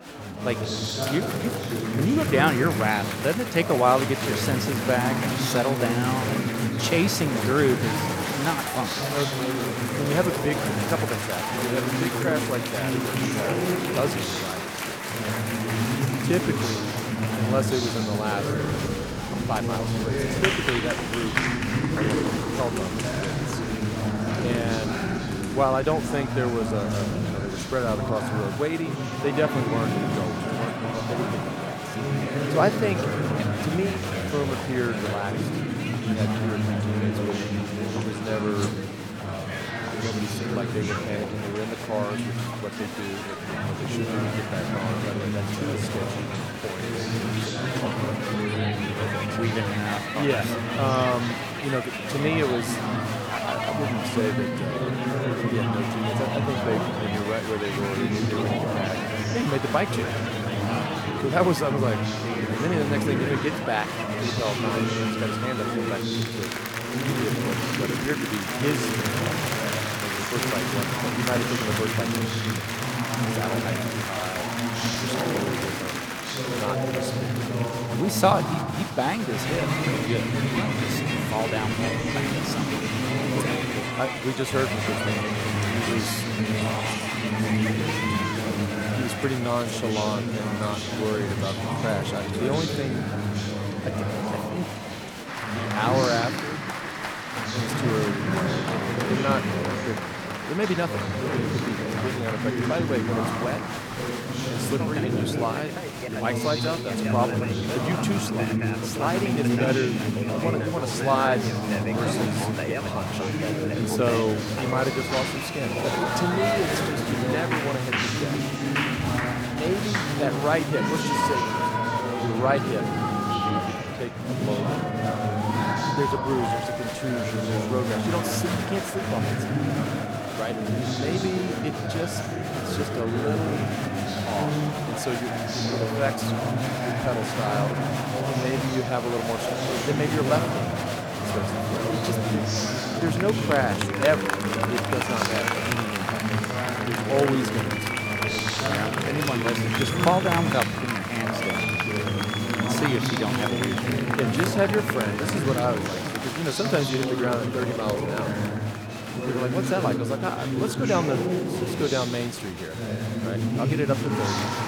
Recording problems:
chatter from many people; very loud; throughout; 2 dB above the speech

